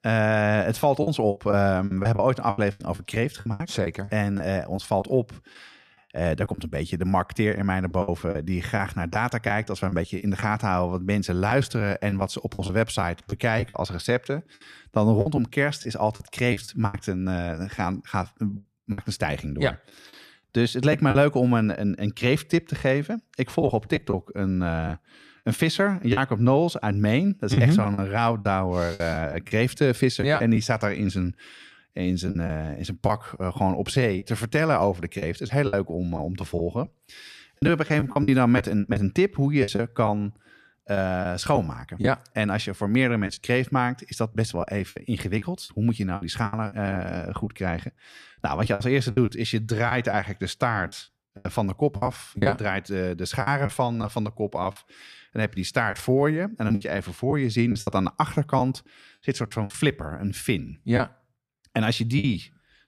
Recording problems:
choppy; very; 8% of the speech affected

